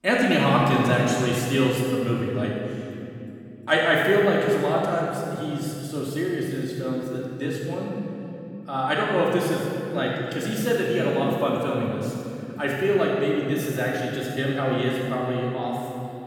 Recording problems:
room echo; strong; dies away in 2.8 s
off-mic speech; far

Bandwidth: 17 kHz